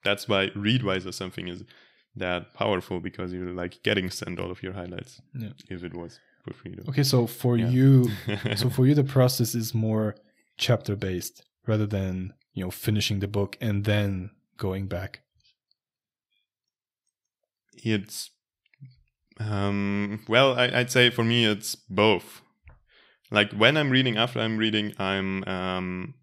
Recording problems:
none

